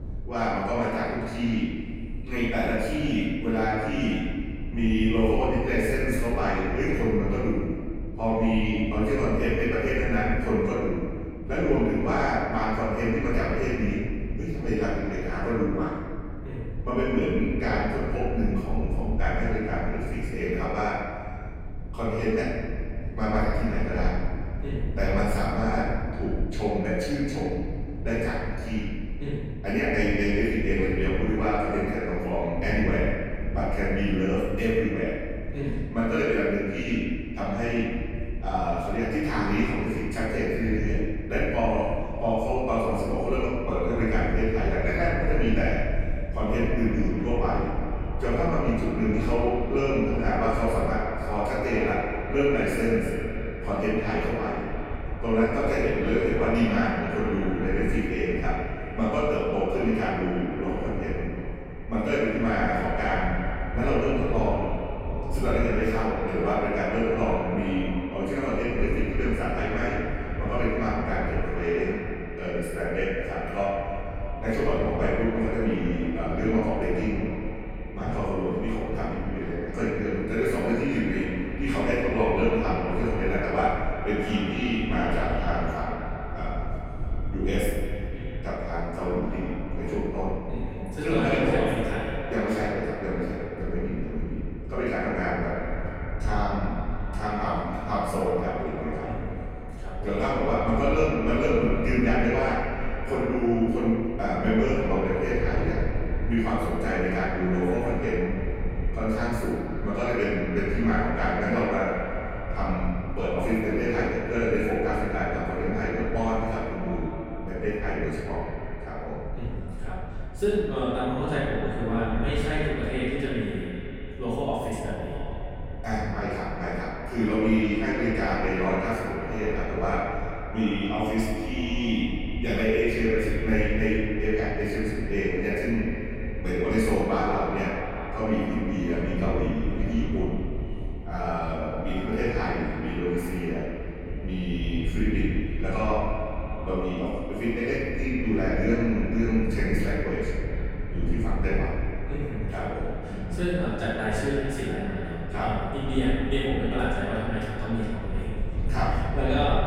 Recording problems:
echo of what is said; strong; from 46 s on; 310 ms later, 10 dB below the speech
room echo; strong; dies away in 2 s
off-mic speech; far
low rumble; noticeable; throughout; 20 dB below the speech

